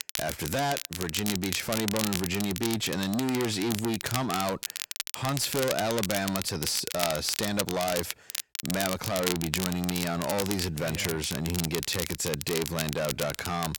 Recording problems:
distortion; heavy; 6 dB below the speech
crackle, like an old record; loud; 4 dB below the speech

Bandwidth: 17 kHz